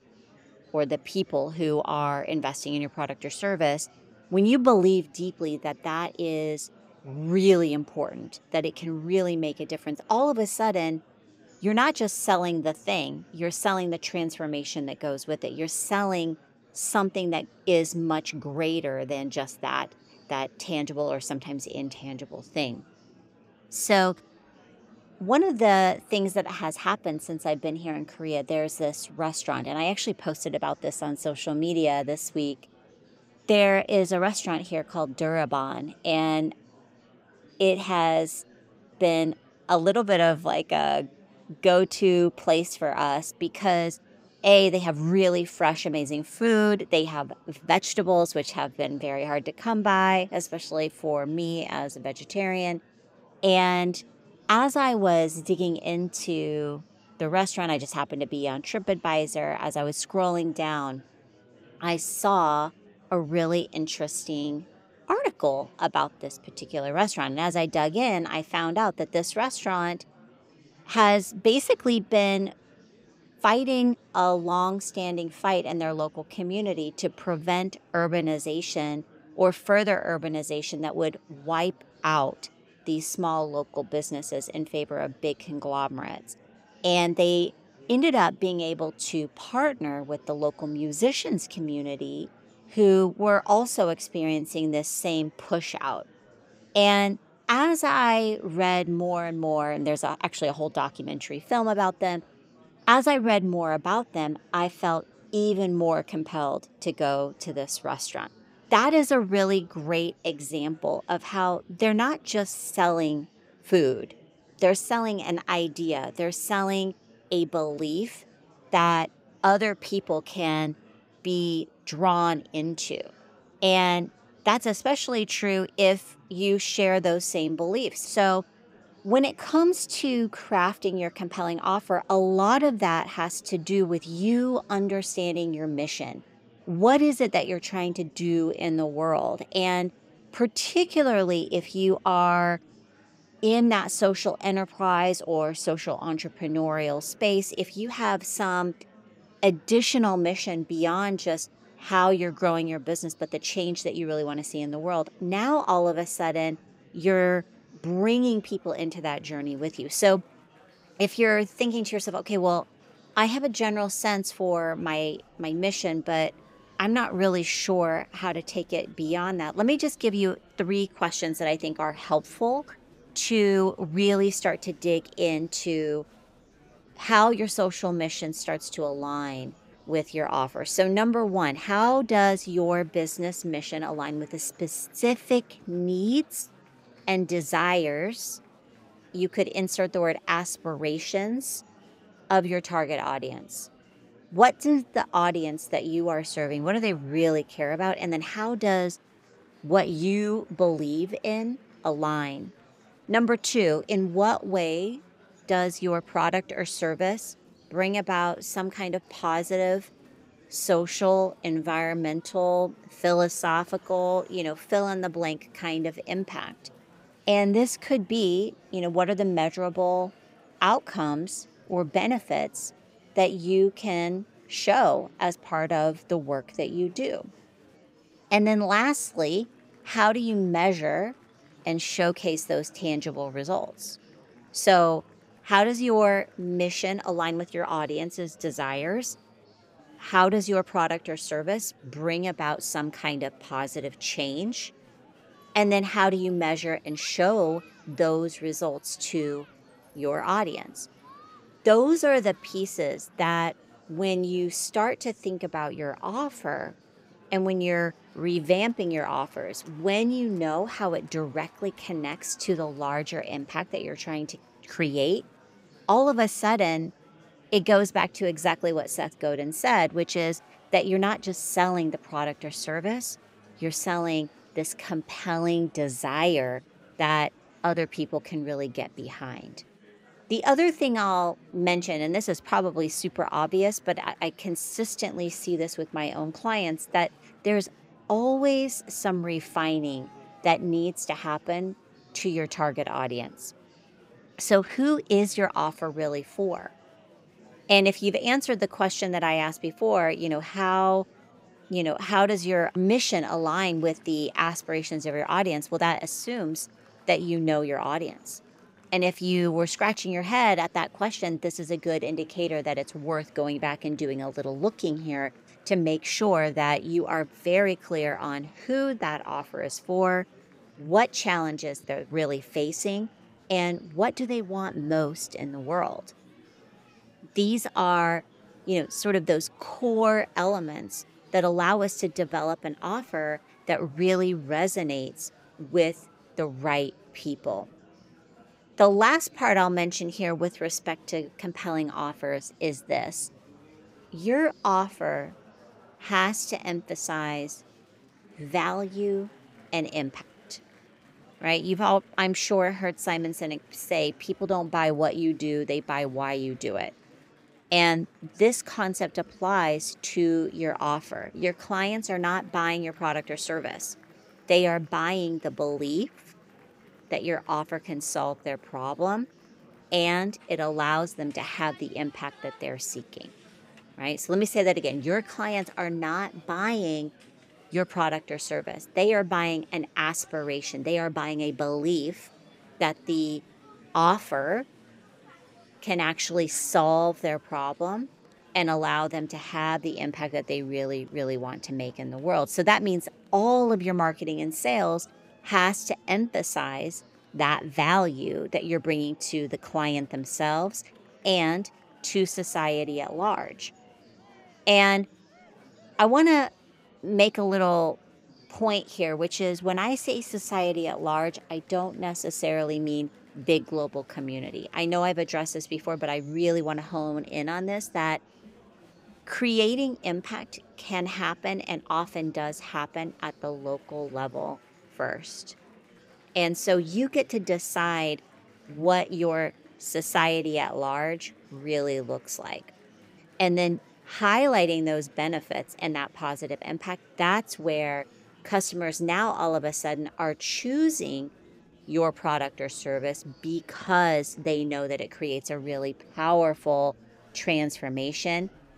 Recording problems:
murmuring crowd; faint; throughout; 30 dB below the speech

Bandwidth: 15.5 kHz